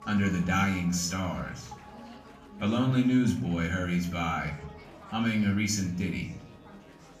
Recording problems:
off-mic speech; far
room echo; slight; dies away in 0.4 s
background music; faint; throughout; 25 dB below the speech
chatter from many people; faint; throughout; 20 dB below the speech

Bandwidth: 15 kHz